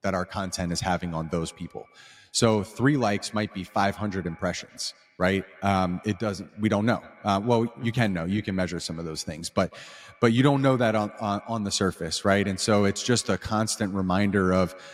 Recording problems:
echo of what is said; faint; throughout; 150 ms later, 25 dB below the speech

